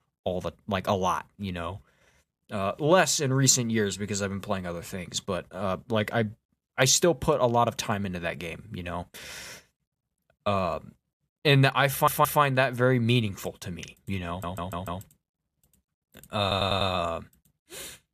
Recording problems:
audio stuttering; at 12 s, at 14 s and at 16 s

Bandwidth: 14.5 kHz